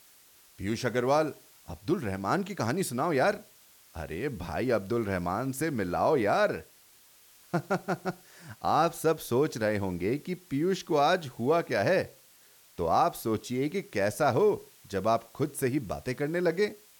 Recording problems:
hiss; faint; throughout; 25 dB below the speech

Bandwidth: 18.5 kHz